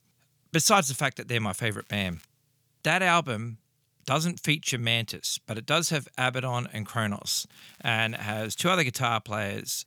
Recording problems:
crackling; faint; at 2 s and from 7.5 to 9 s; 30 dB below the speech

